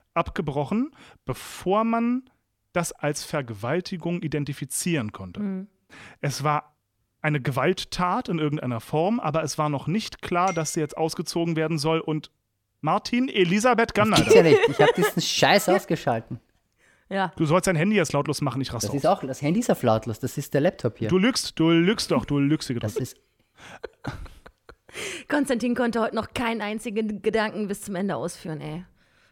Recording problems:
none

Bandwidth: 17.5 kHz